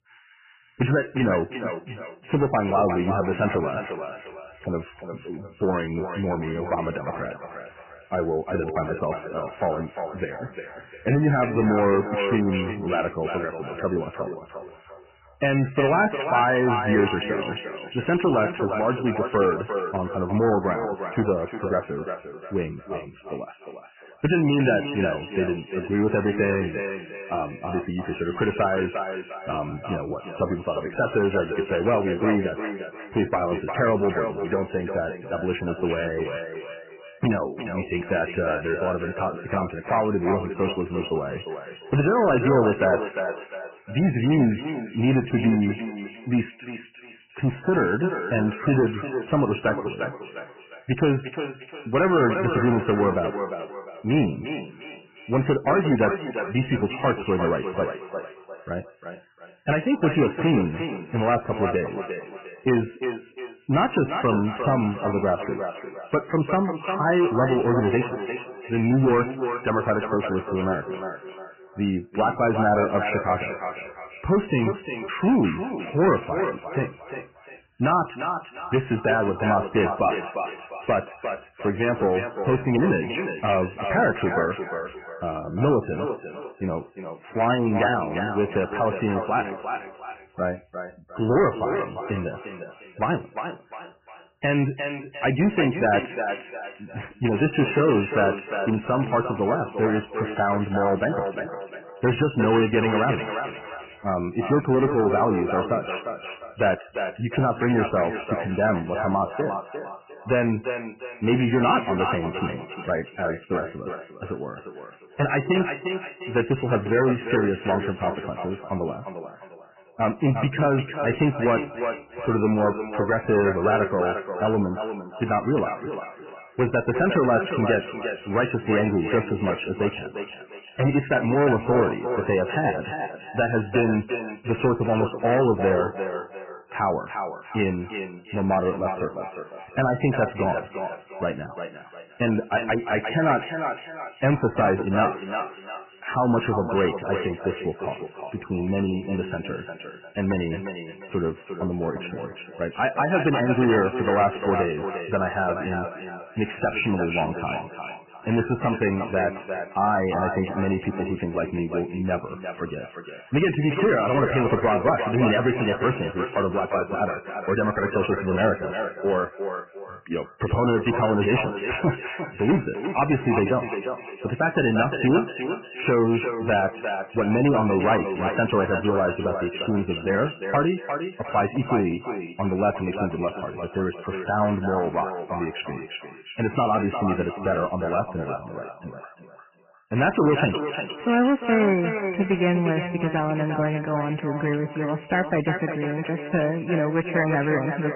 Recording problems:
echo of what is said; strong; throughout; 350 ms later, 8 dB below the speech
garbled, watery; badly; nothing above 3 kHz
distortion; slight; 5% of the sound clipped

